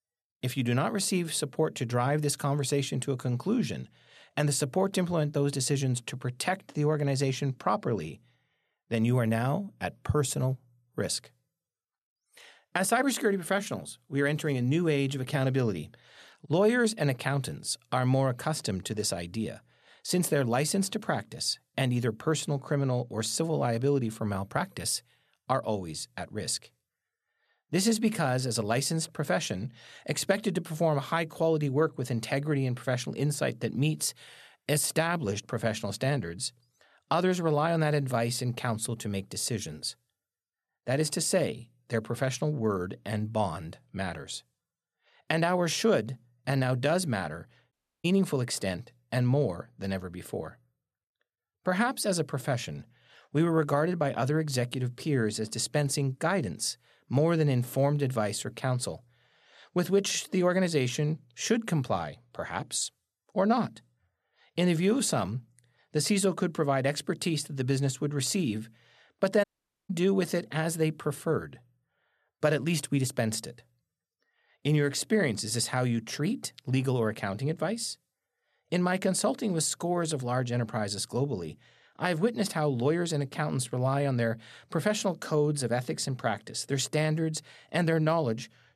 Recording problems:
audio cutting out; at 48 s and at 1:09

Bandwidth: 13.5 kHz